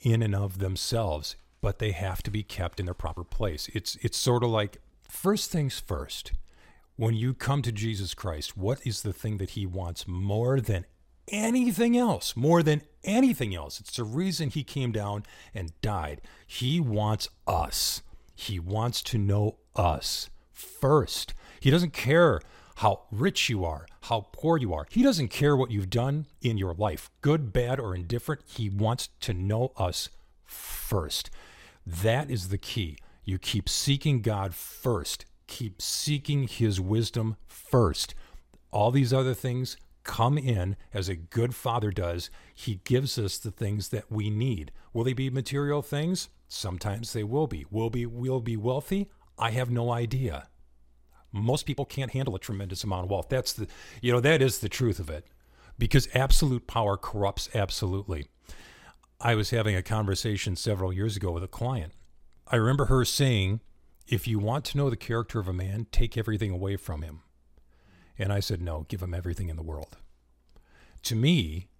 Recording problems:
uneven, jittery; strongly; from 3 s to 1:05

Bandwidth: 16 kHz